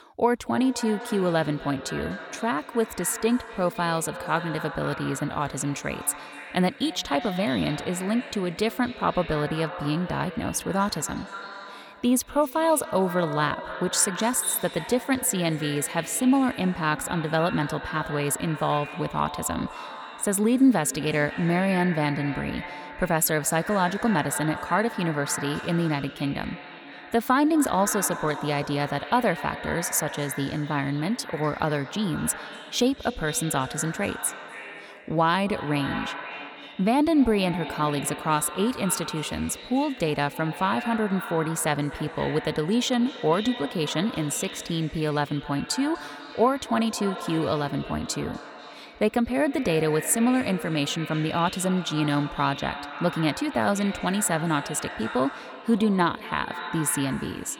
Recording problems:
echo of what is said; strong; throughout; 250 ms later, 10 dB below the speech

